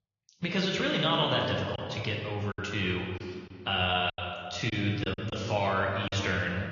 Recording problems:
room echo; noticeable; dies away in 1.8 s
high frequencies cut off; noticeable; nothing above 7 kHz
off-mic speech; somewhat distant
garbled, watery; slightly
choppy; very; 6% of the speech affected

